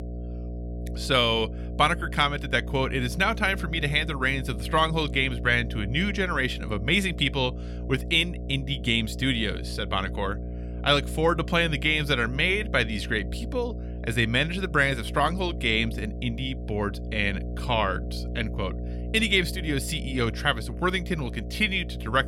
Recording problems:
electrical hum; noticeable; throughout; 60 Hz, 20 dB below the speech

